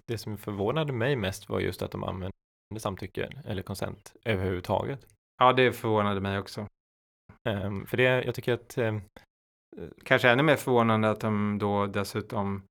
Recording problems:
audio freezing; at 2.5 s and at 6.5 s for 0.5 s

